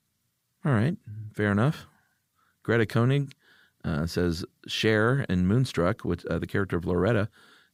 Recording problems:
none

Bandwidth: 15.5 kHz